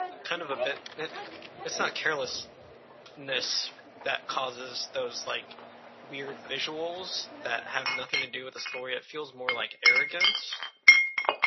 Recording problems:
thin; very; fading below 600 Hz
garbled, watery; slightly; nothing above 6 kHz
household noises; very loud; throughout; 9 dB above the speech

